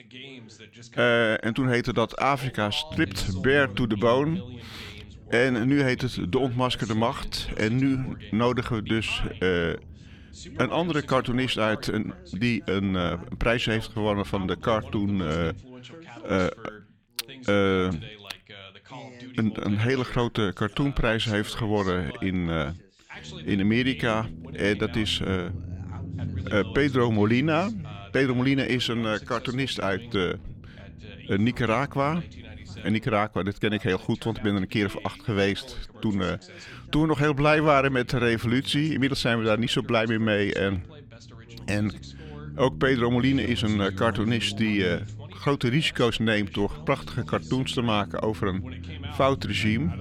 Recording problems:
background chatter; noticeable; throughout; 2 voices, 20 dB below the speech
low rumble; faint; from 3 to 16 s, from 23 to 33 s and from 37 s on; 25 dB below the speech

